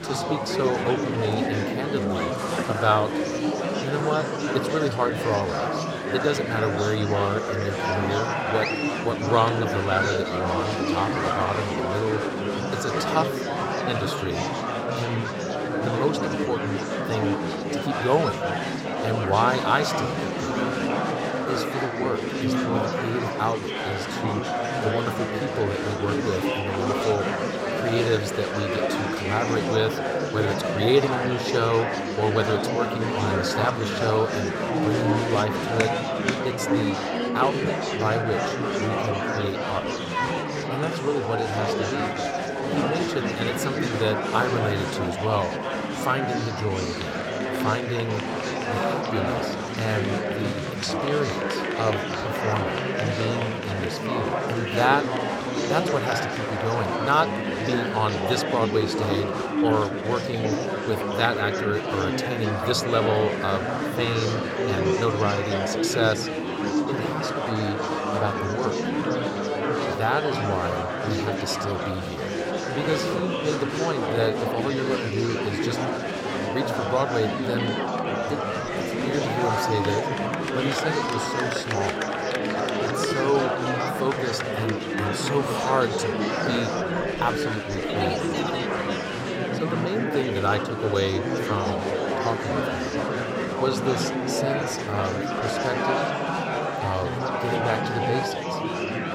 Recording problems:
murmuring crowd; very loud; throughout; 1 dB above the speech

